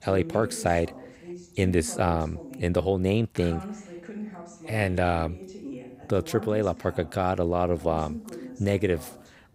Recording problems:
voice in the background; noticeable; throughout; 15 dB below the speech

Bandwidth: 15.5 kHz